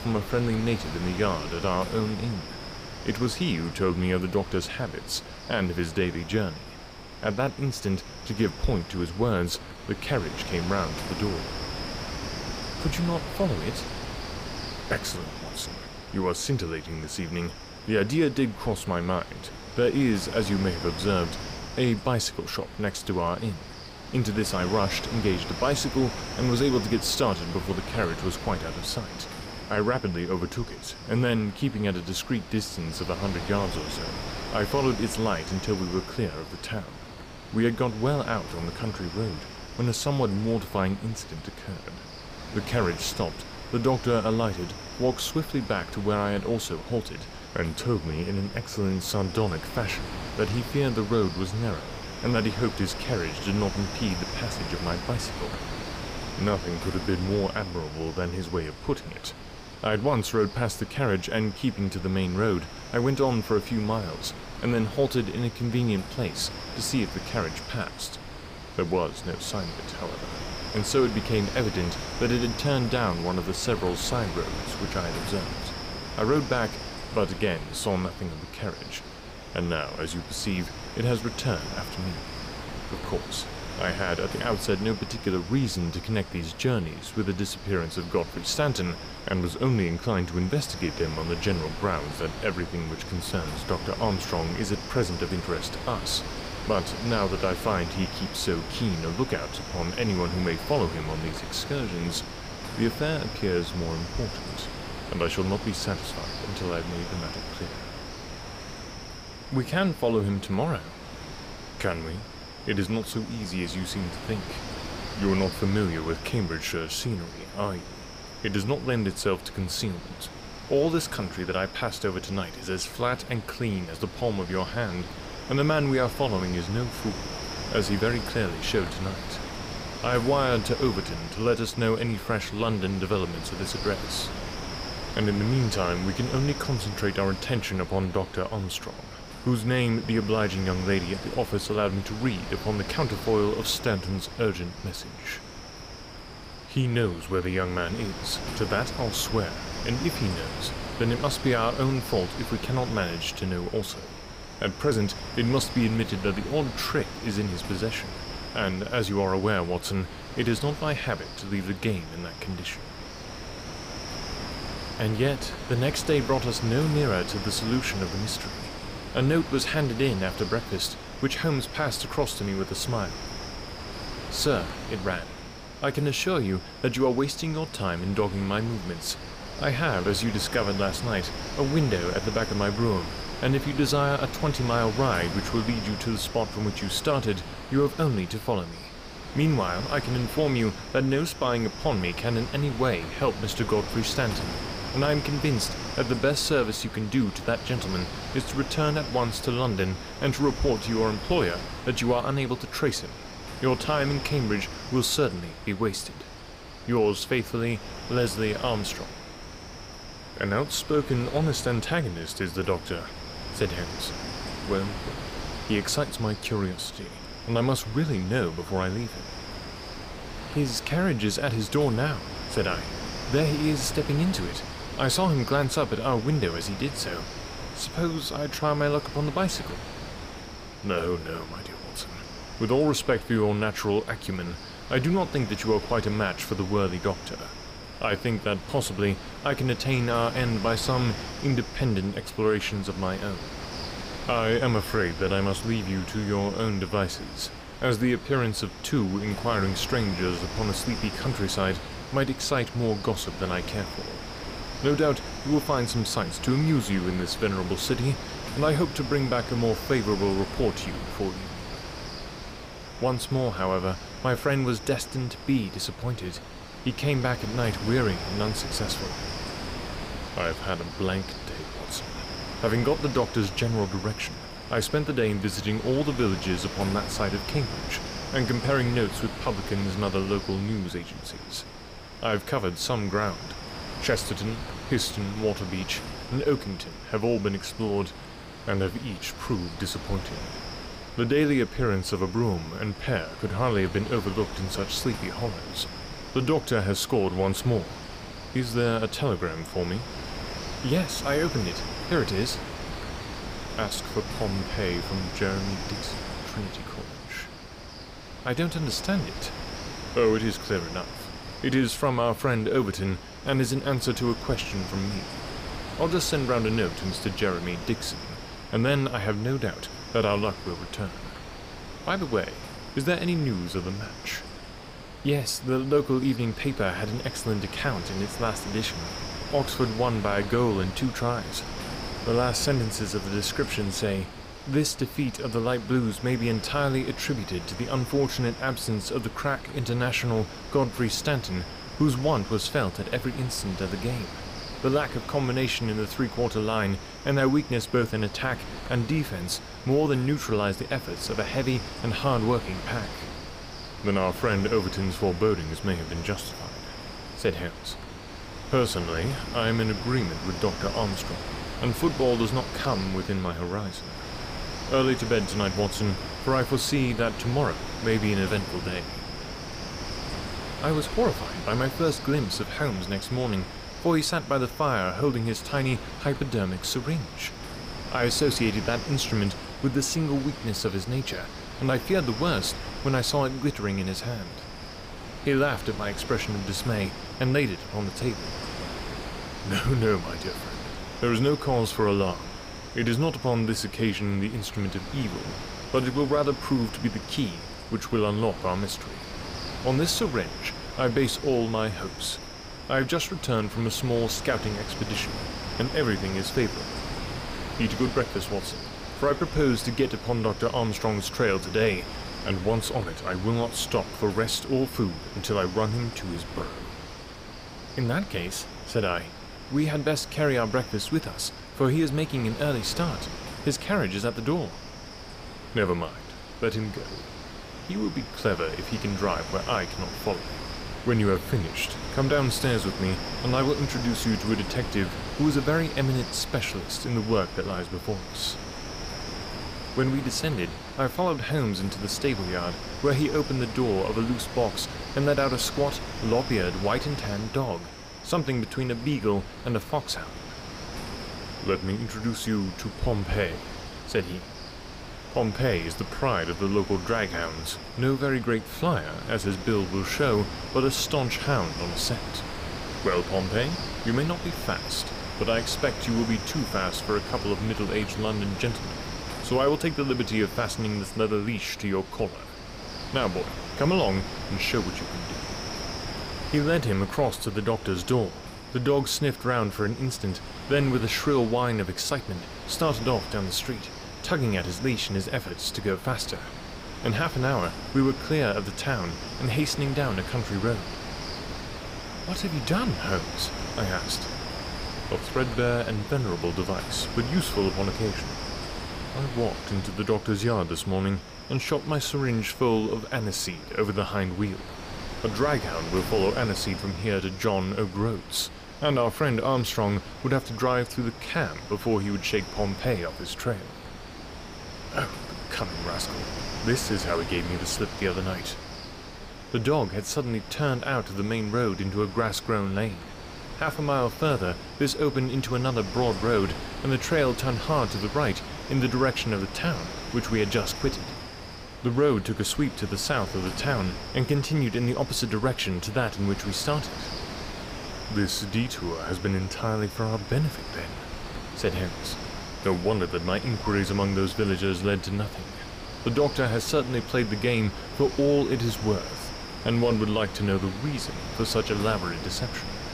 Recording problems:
wind noise on the microphone; heavy; 8 dB below the speech

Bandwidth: 15 kHz